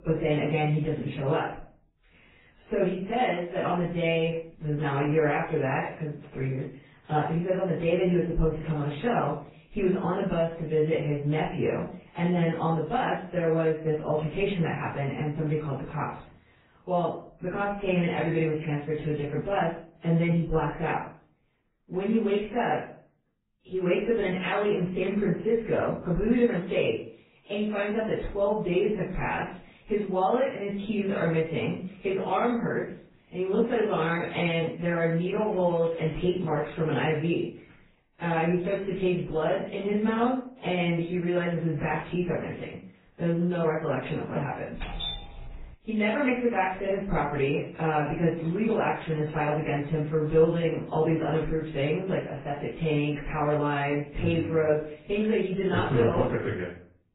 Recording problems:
off-mic speech; far
garbled, watery; badly; nothing above 4 kHz
room echo; noticeable; dies away in 0.4 s
crackling; faint; from 35 to 37 s and from 55 to 56 s; 30 dB below the speech
doorbell; noticeable; at 45 s; peak 5 dB below the speech

